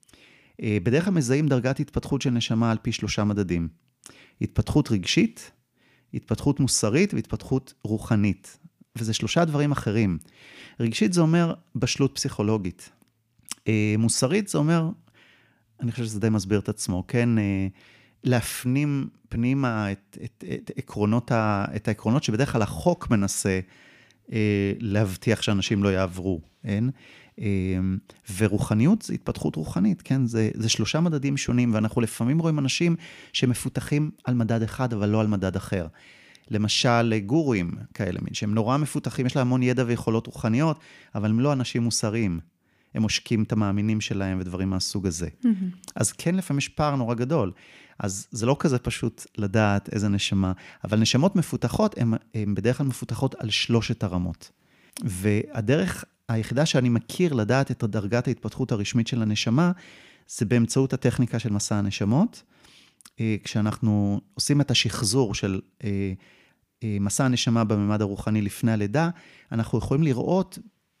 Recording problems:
none

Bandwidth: 15 kHz